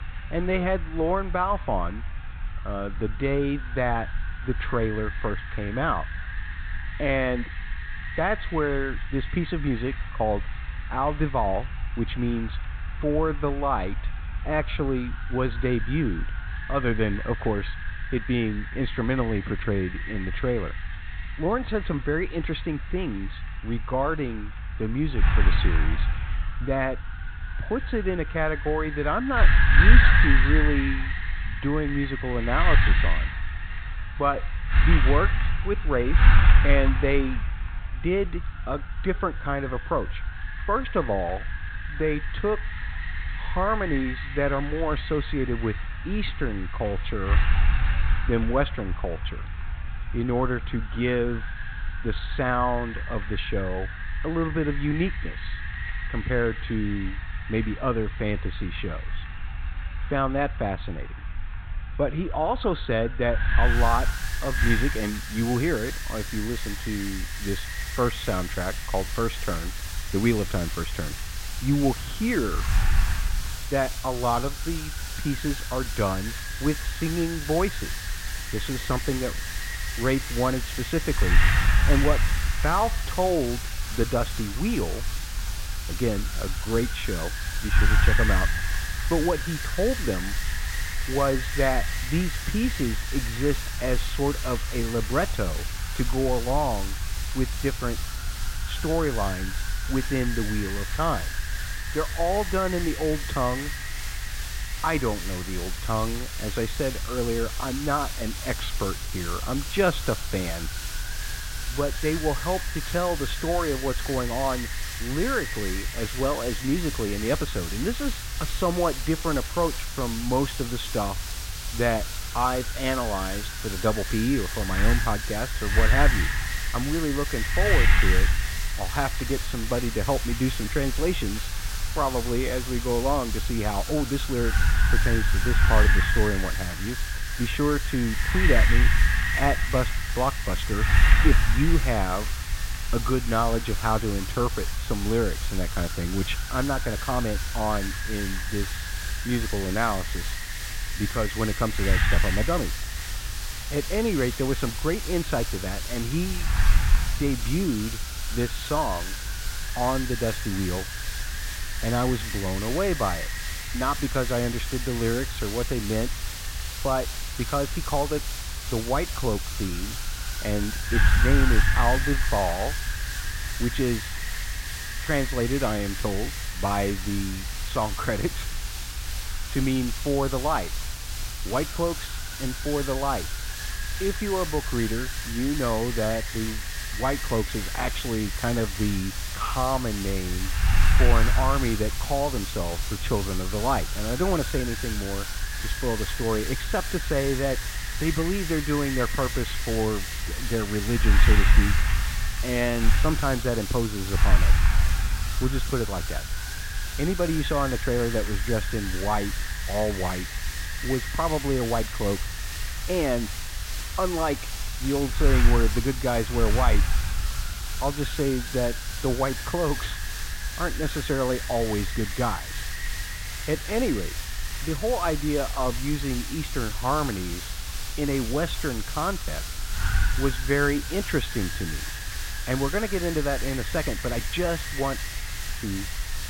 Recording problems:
high frequencies cut off; severe; nothing above 4 kHz
wind noise on the microphone; heavy; 5 dB below the speech
hiss; loud; from 1:04 on; 7 dB below the speech

